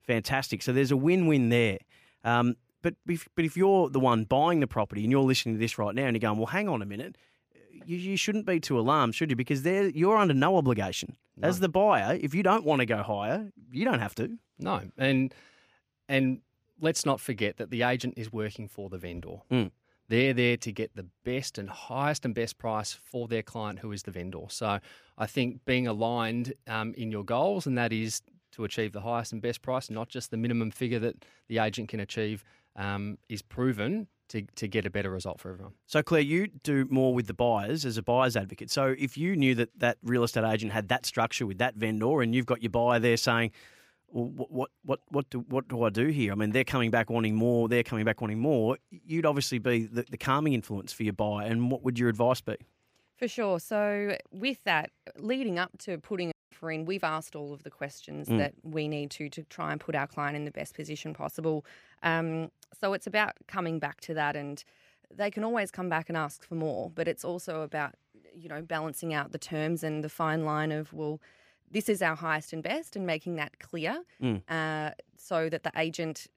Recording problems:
audio cutting out; at 56 s

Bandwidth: 15 kHz